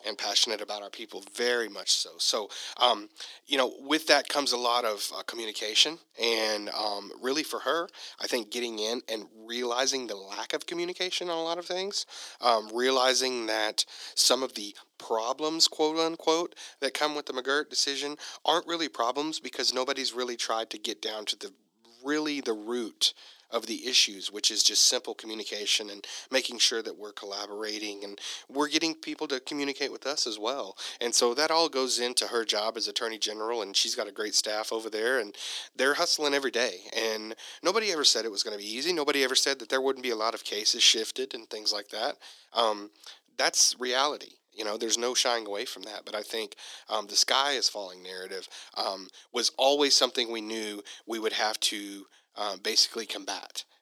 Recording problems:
thin; very; fading below 300 Hz

